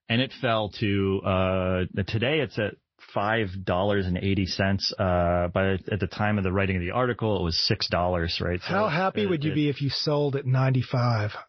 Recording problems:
garbled, watery; slightly; nothing above 5 kHz
high frequencies cut off; slight

